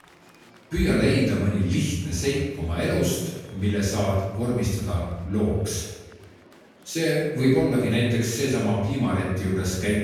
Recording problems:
room echo; strong; dies away in 0.9 s
off-mic speech; far
murmuring crowd; faint; throughout; 25 dB below the speech

